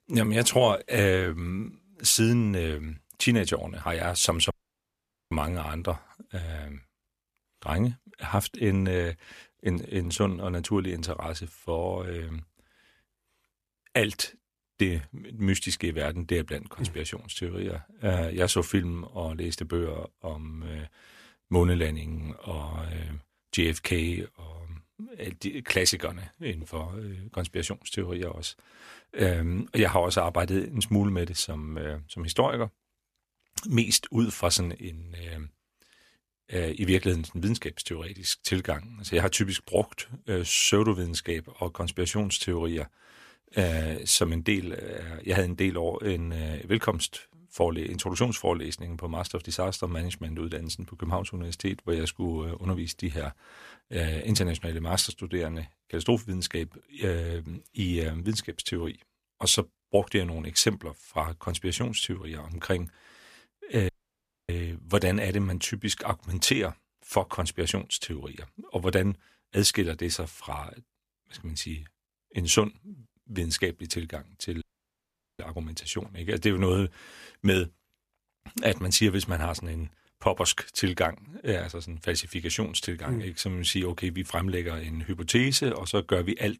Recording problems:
audio cutting out; at 4.5 s for 1 s, at 1:04 for 0.5 s and at 1:15 for 1 s

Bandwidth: 14.5 kHz